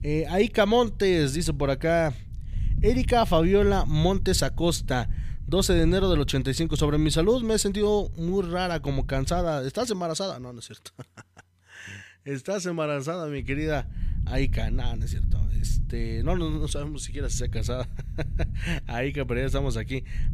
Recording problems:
low rumble; faint; until 9.5 s and from 13 s on; 20 dB below the speech

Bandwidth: 15 kHz